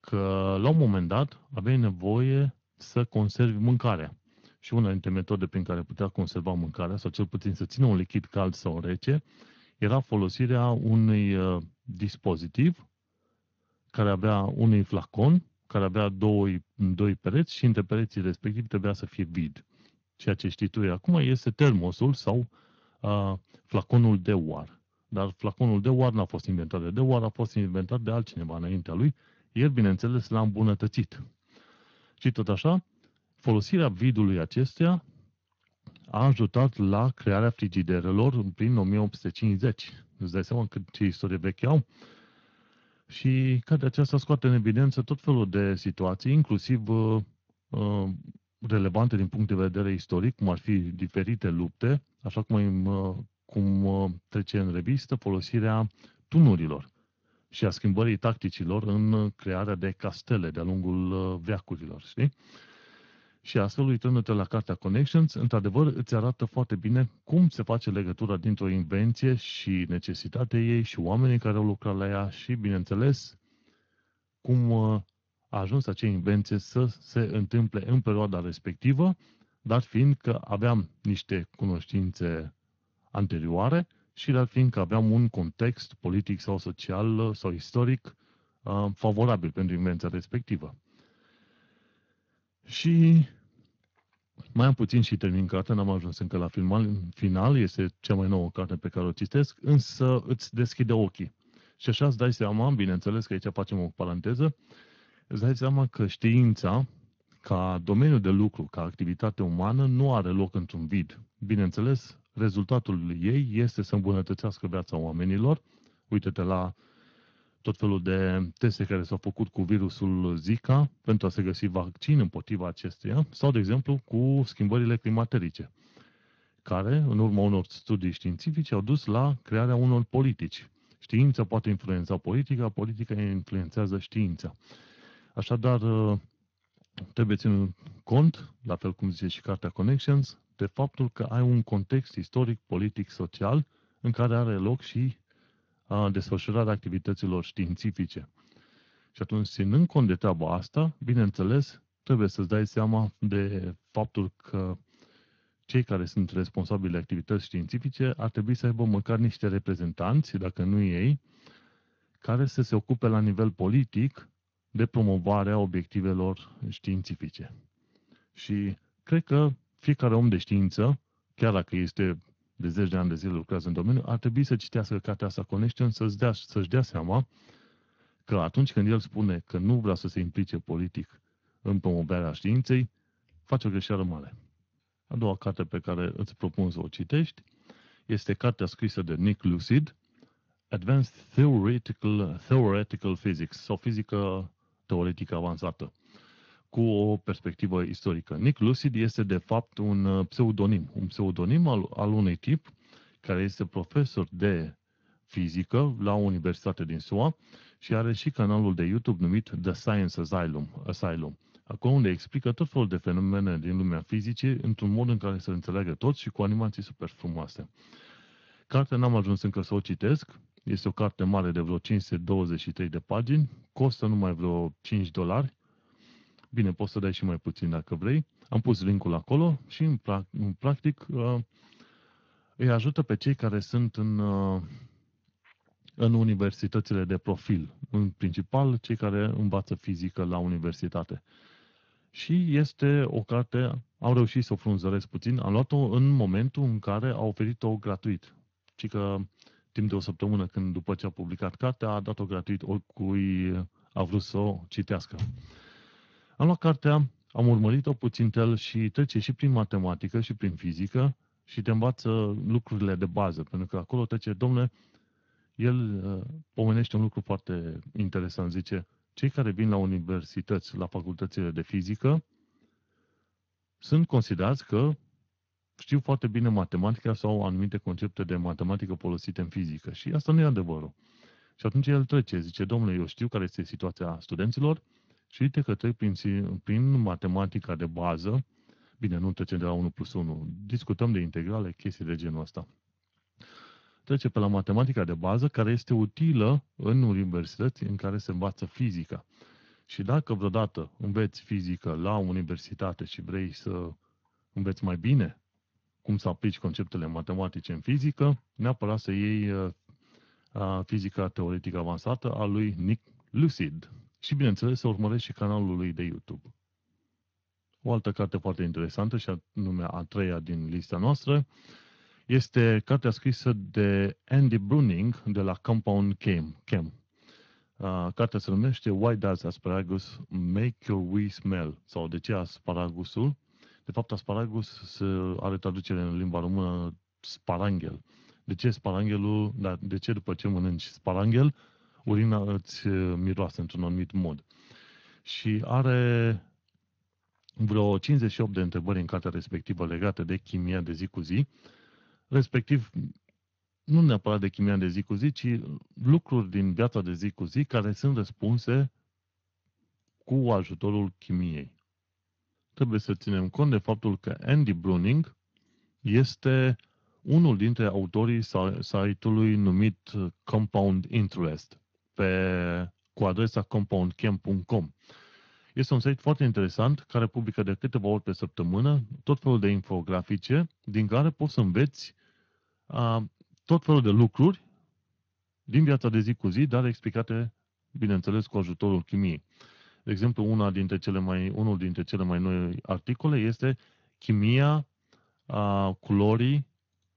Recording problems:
garbled, watery; slightly; nothing above 18.5 kHz
uneven, jittery; strongly; from 51 s to 6:04

